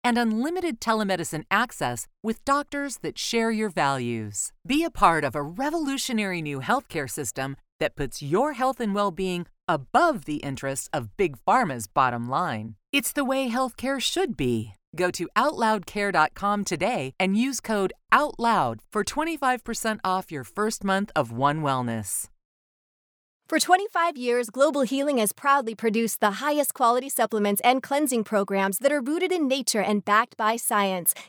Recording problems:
none

